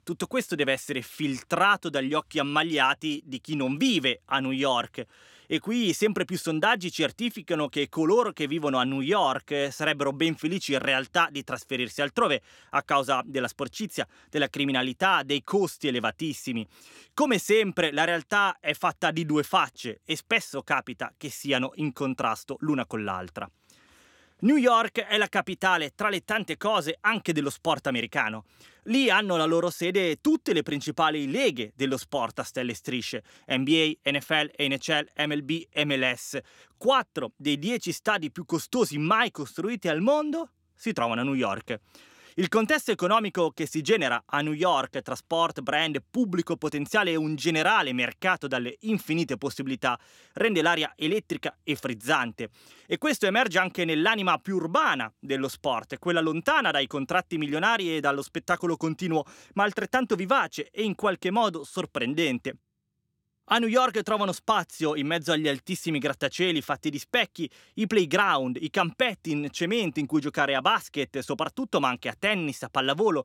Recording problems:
none

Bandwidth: 16.5 kHz